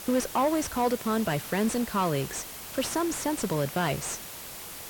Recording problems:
distortion; slight; 10 dB below the speech
hiss; noticeable; throughout; 10 dB below the speech

